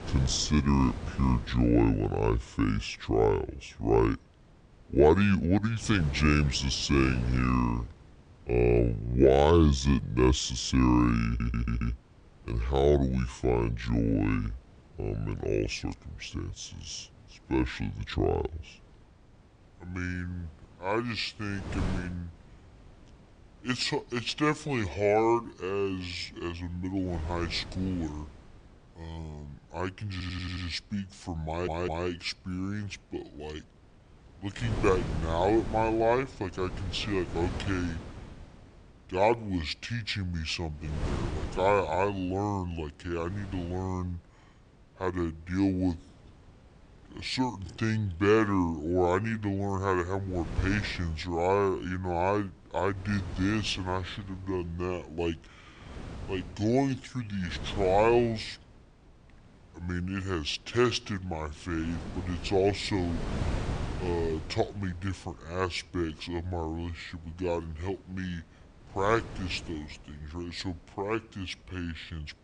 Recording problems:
wrong speed and pitch; too slow and too low; 0.6 times normal speed
wind noise on the microphone; occasional gusts; 15 dB below the speech
audio stuttering; at 11 s, at 30 s and at 31 s

